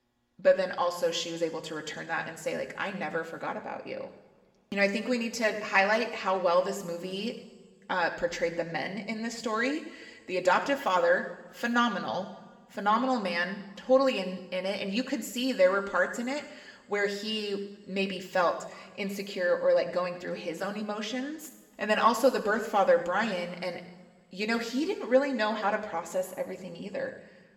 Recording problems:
room echo; slight; dies away in 1.3 s
off-mic speech; somewhat distant

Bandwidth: 17 kHz